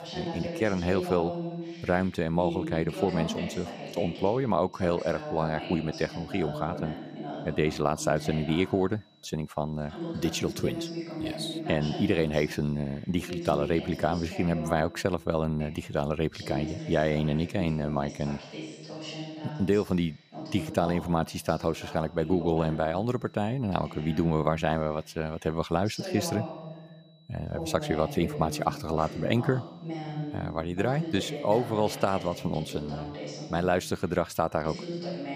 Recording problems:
voice in the background; loud; throughout; 9 dB below the speech
high-pitched whine; faint; throughout; 4 kHz, 35 dB below the speech

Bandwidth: 15 kHz